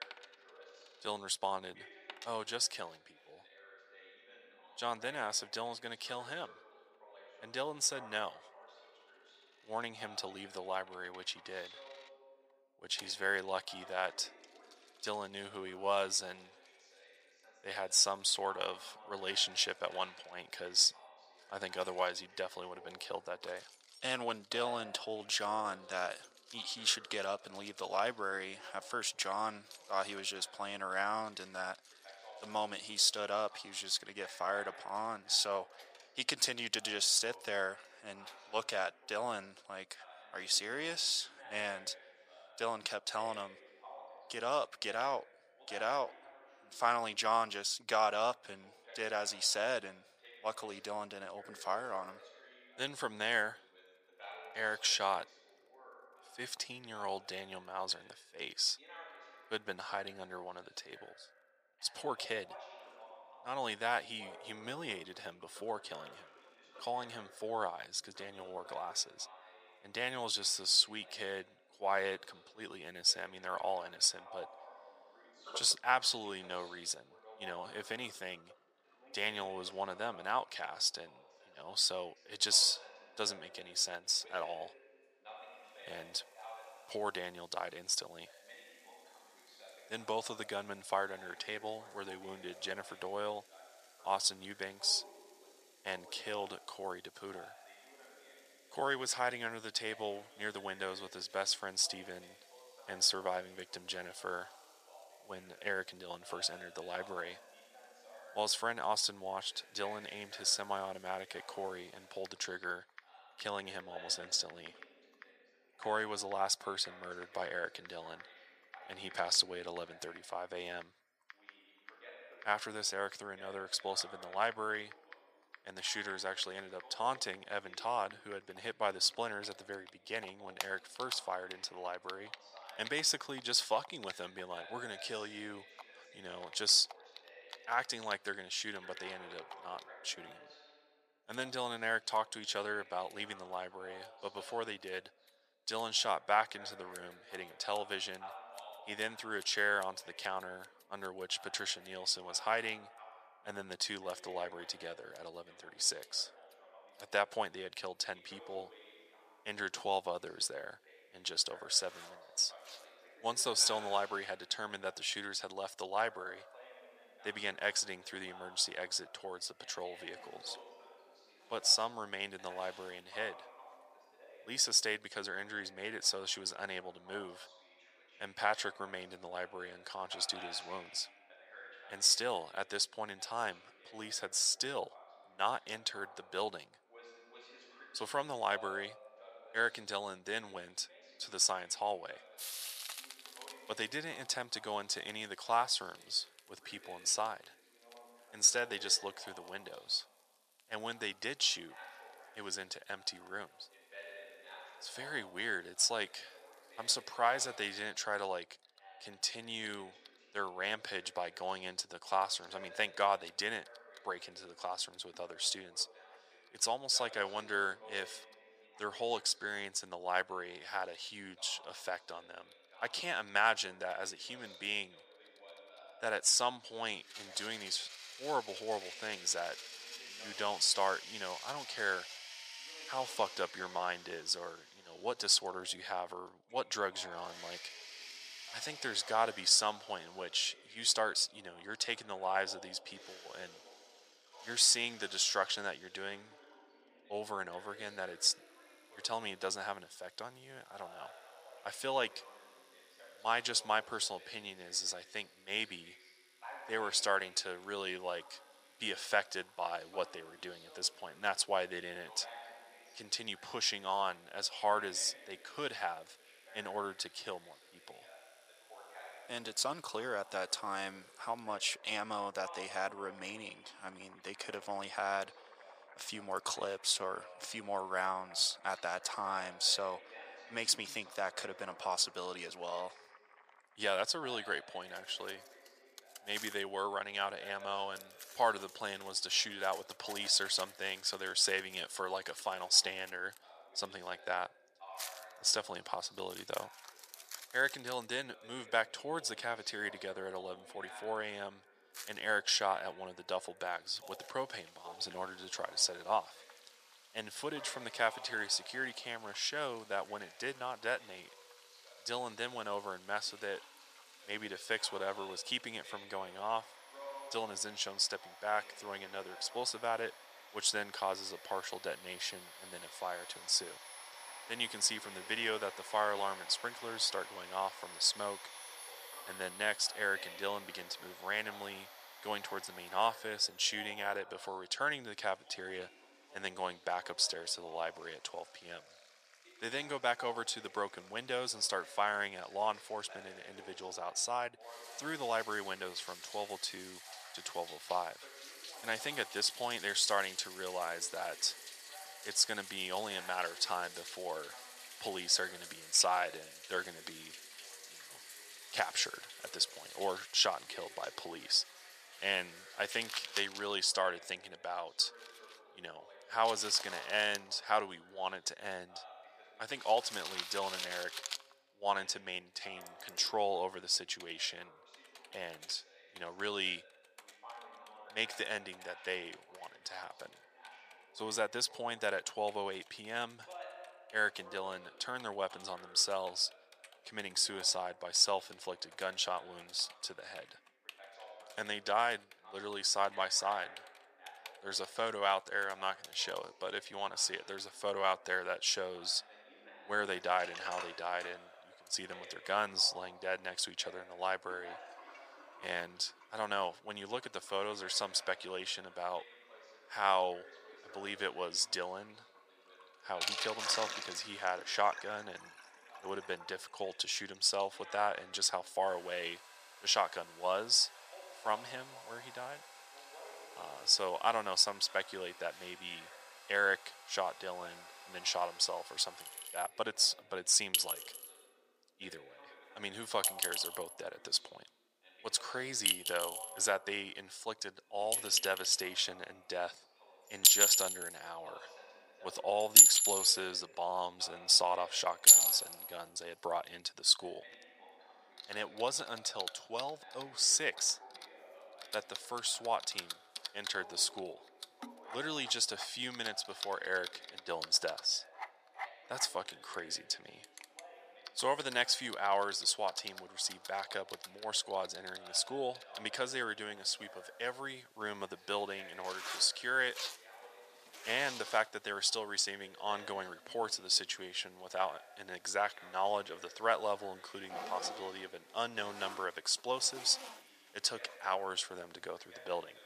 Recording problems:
thin; very; fading below 800 Hz
household noises; loud; throughout; 1 dB below the speech
voice in the background; faint; throughout; 20 dB below the speech

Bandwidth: 14.5 kHz